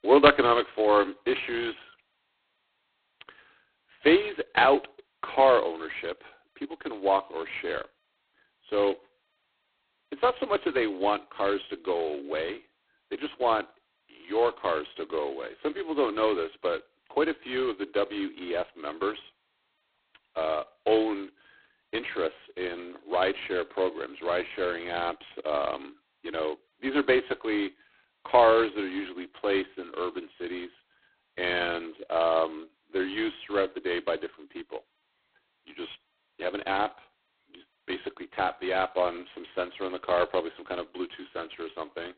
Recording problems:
phone-call audio; poor line; nothing above 4 kHz

